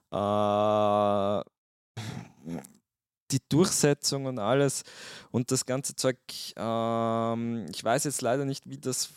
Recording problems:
none

